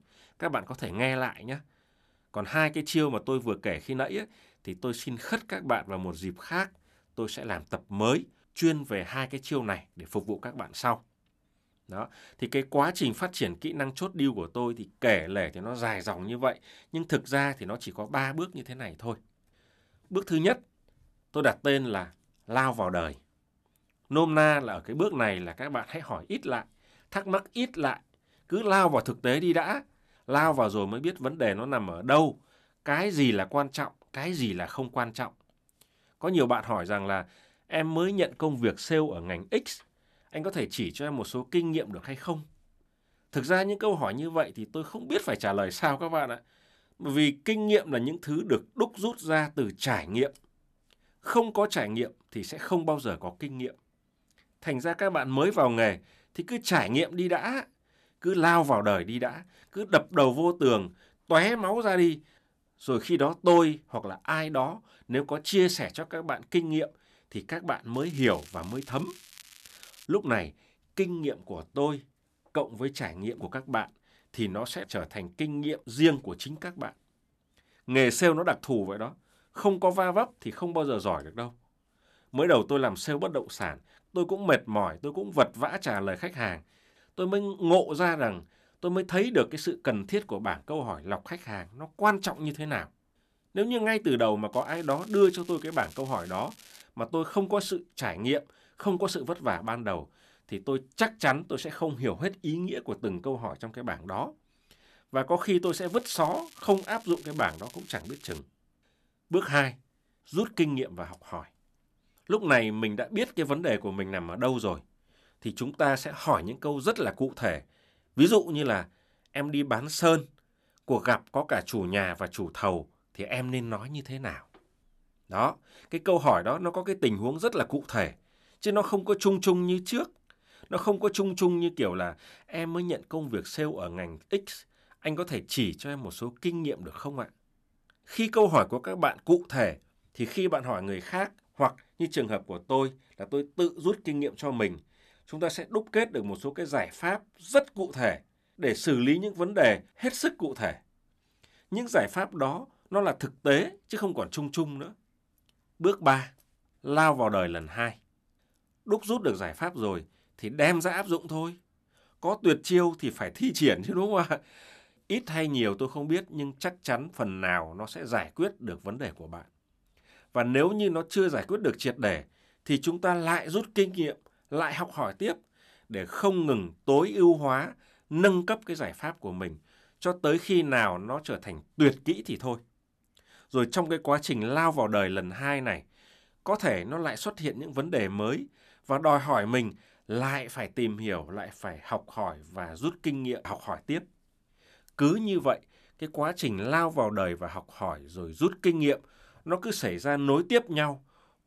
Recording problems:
crackling; faint; from 1:08 to 1:10, from 1:35 to 1:37 and from 1:46 to 1:48; 20 dB below the speech

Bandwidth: 13.5 kHz